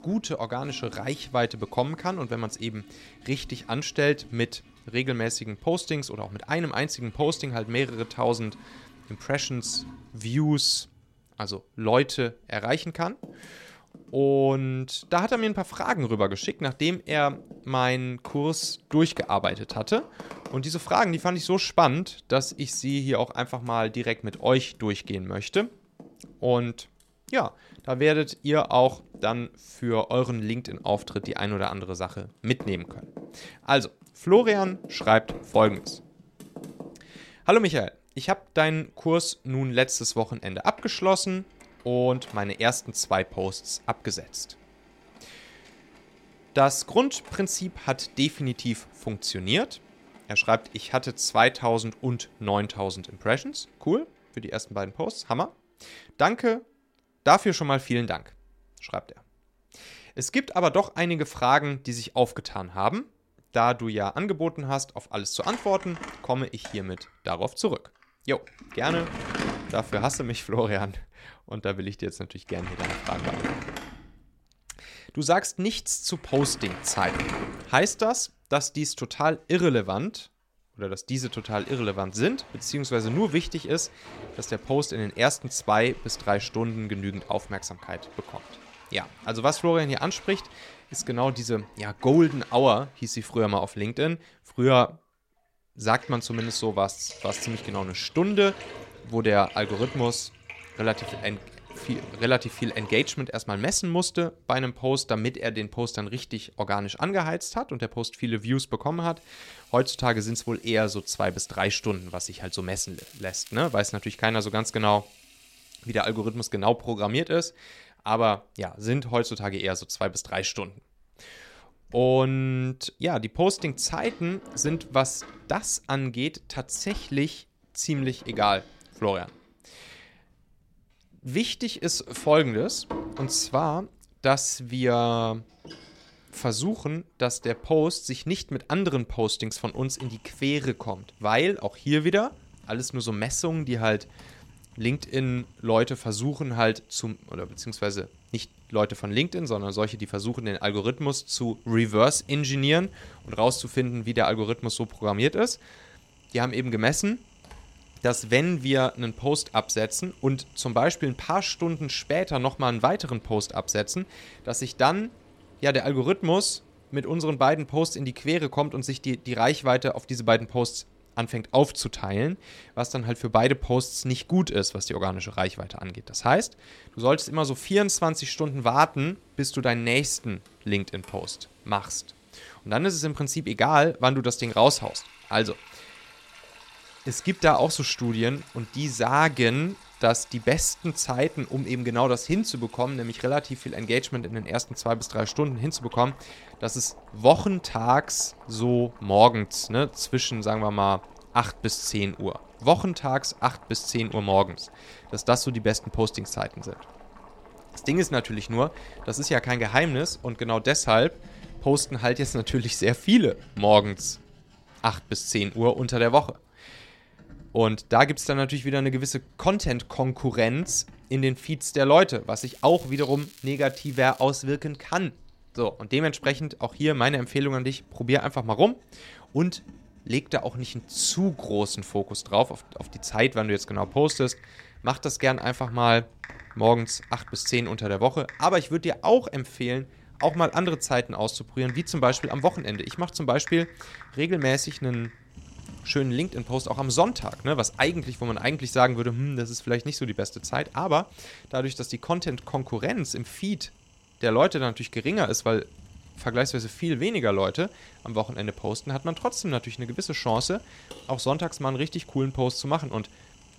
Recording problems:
household noises; noticeable; throughout; 20 dB below the speech
crackling; faint; at 1:53 and from 3:42 to 3:44; 20 dB below the speech

